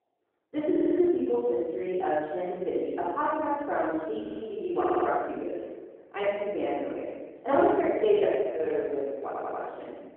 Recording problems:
room echo; strong; dies away in 1.3 s
off-mic speech; far
muffled; very; fading above 2.5 kHz
phone-call audio
audio stuttering; 4 times, first at 0.5 s
uneven, jittery; strongly; from 2 to 9 s

